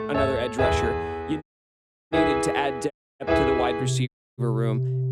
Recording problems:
background music; very loud; throughout; 3 dB above the speech
audio cutting out; at 1.5 s for 0.5 s, at 3 s and at 4 s

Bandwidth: 14.5 kHz